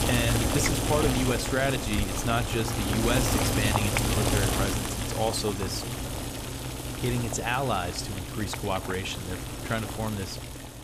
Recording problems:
household noises; very loud; throughout; 1 dB above the speech

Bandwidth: 15 kHz